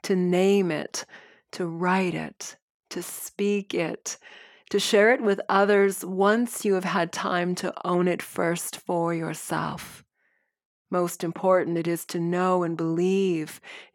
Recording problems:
none

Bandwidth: 17.5 kHz